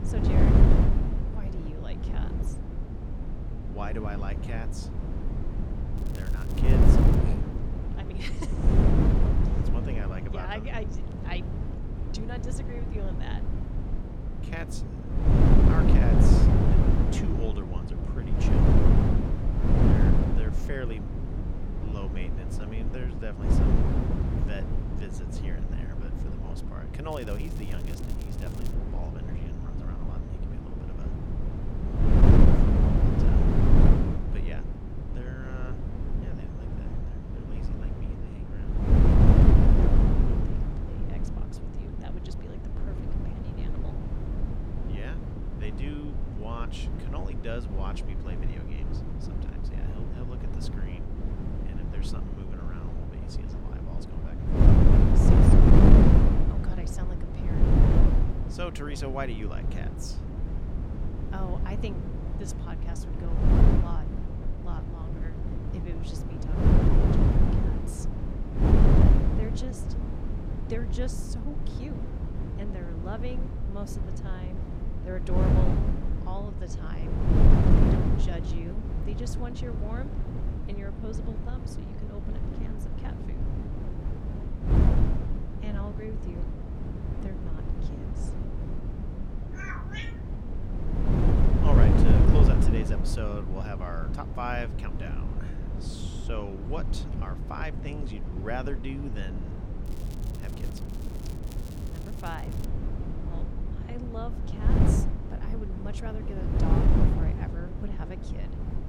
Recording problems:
wind noise on the microphone; heavy; 4 dB above the speech
crackling; noticeable; from 6 to 7 s, from 27 to 29 s and from 1:40 to 1:43; 10 dB below the speech

